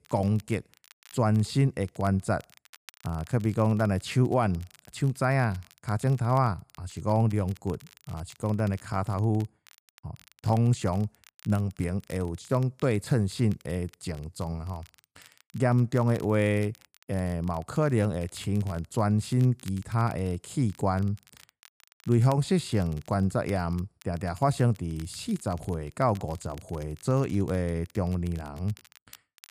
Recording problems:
crackle, like an old record; faint; 25 dB below the speech

